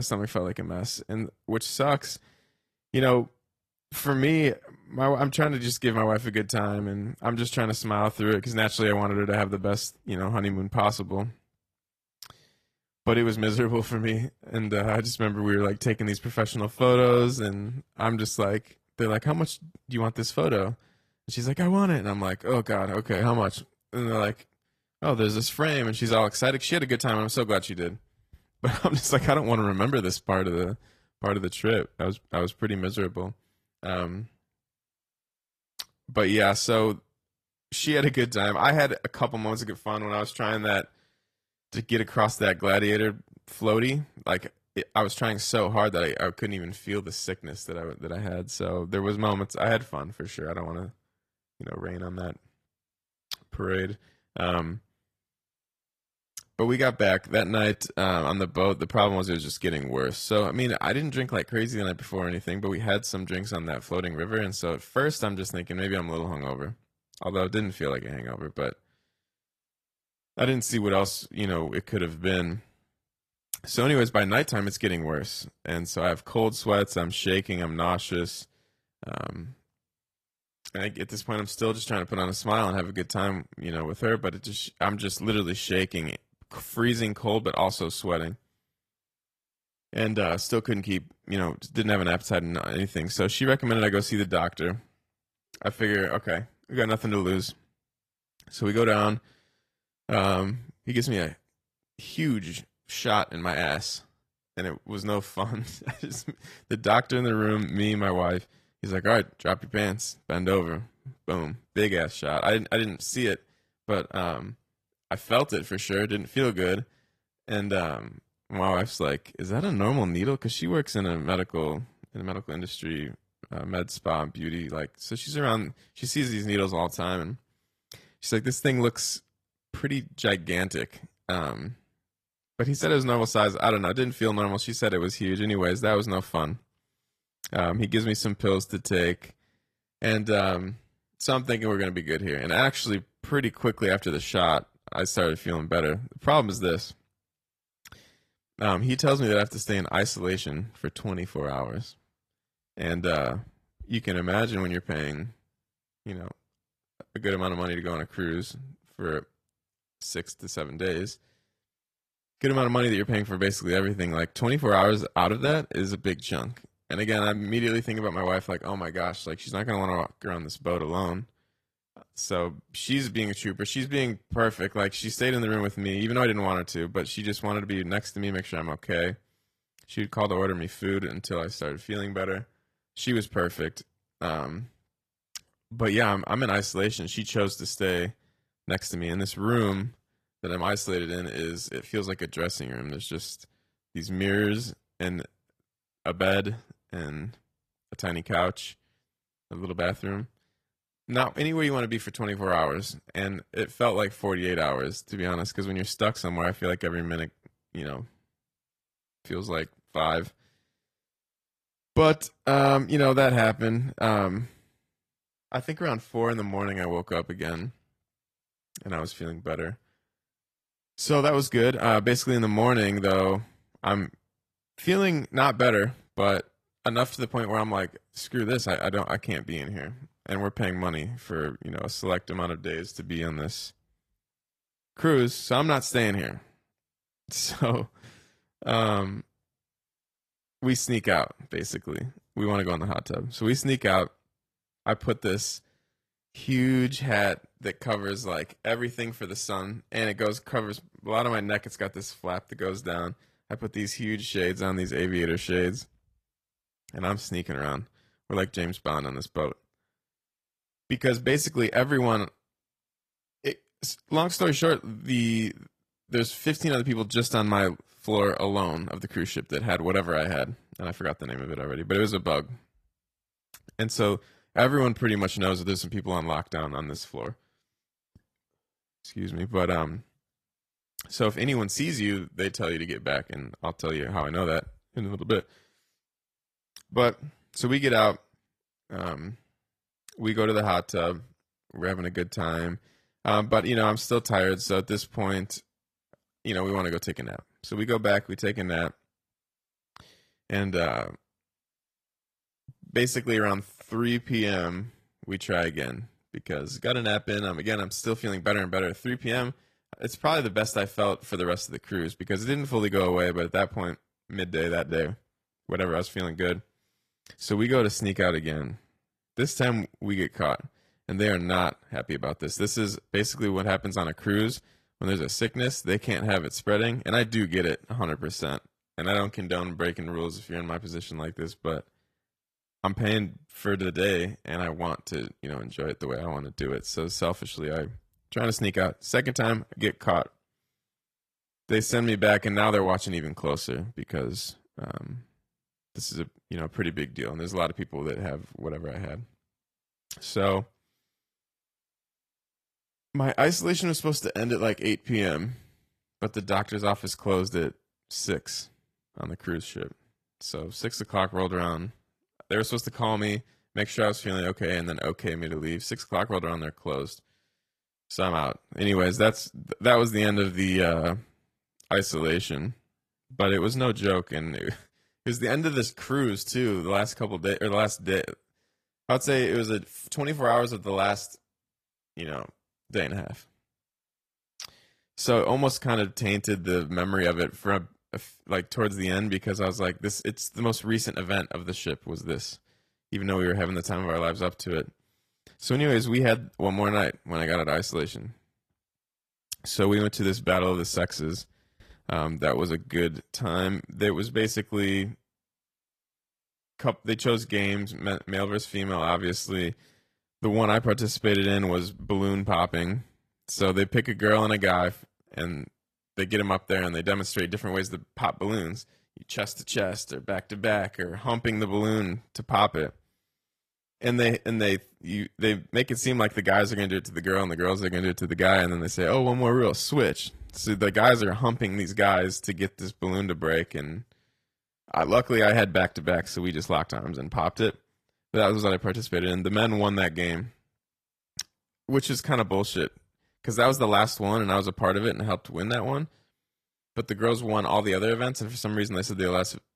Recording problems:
garbled, watery; slightly; nothing above 14.5 kHz
abrupt cut into speech; at the start

